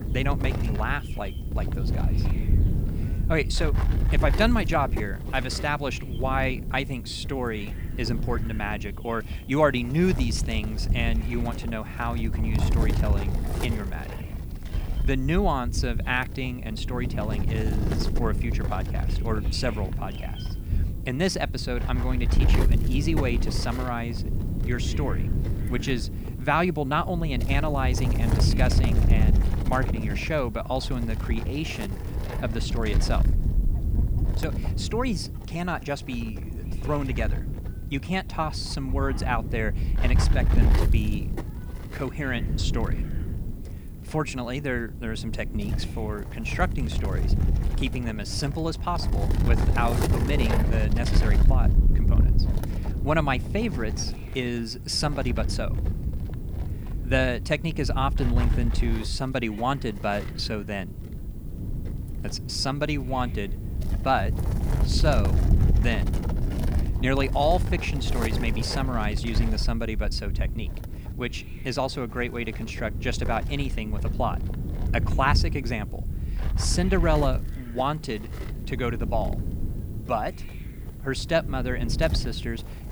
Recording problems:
wind noise on the microphone; heavy; 10 dB below the speech
animal sounds; faint; throughout; 30 dB below the speech
hiss; faint; throughout; 25 dB below the speech

